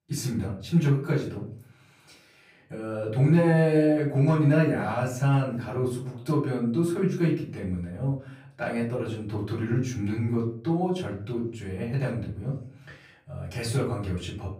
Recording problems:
off-mic speech; far
room echo; slight; dies away in 0.5 s

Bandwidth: 15.5 kHz